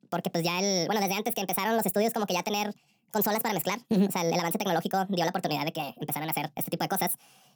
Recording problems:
wrong speed and pitch; too fast and too high; 1.6 times normal speed

